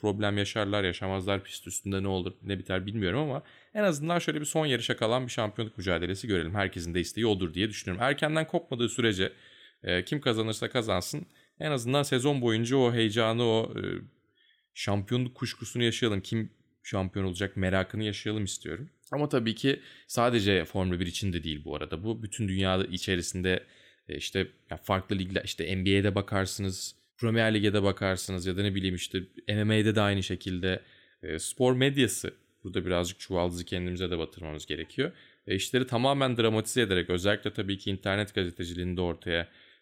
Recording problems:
none

